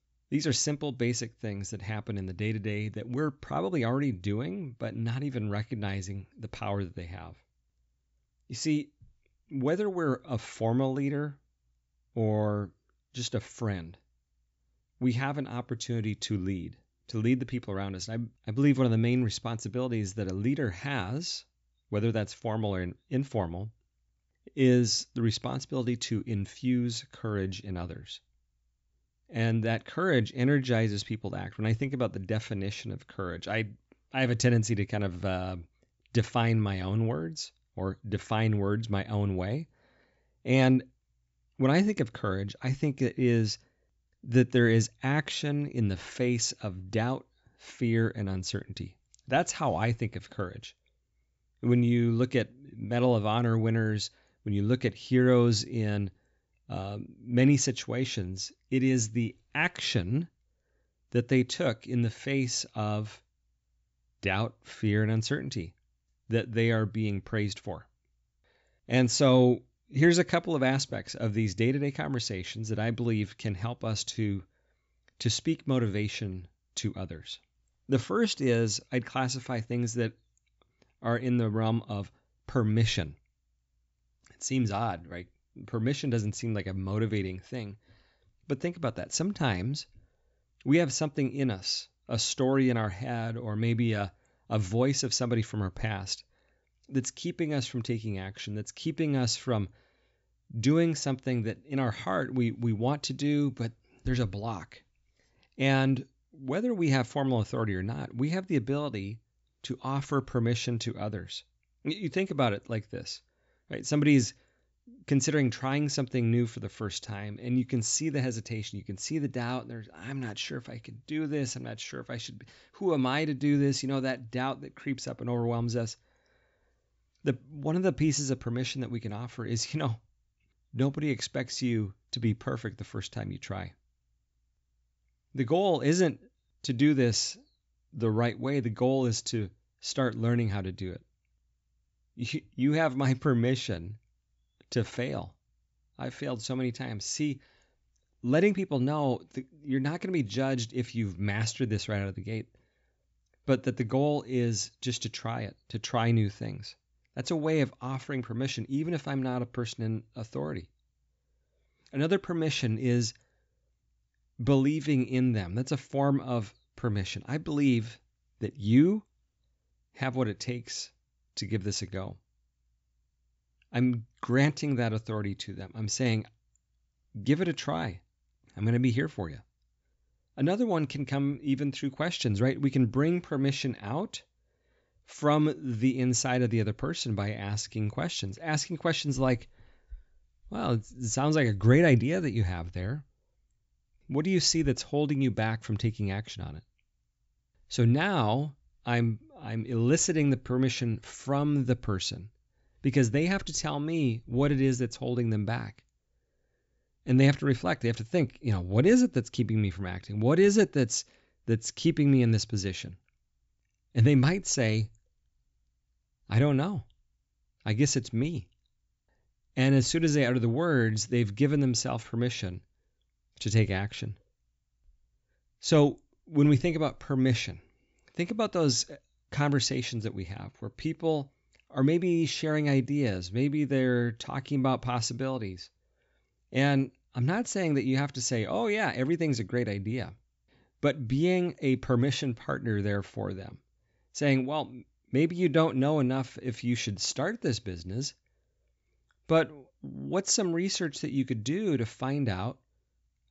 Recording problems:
high frequencies cut off; noticeable; nothing above 8 kHz

